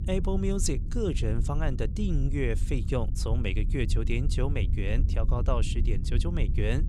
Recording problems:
low rumble; noticeable; throughout; 10 dB below the speech

